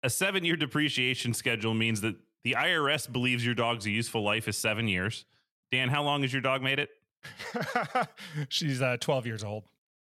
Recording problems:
none

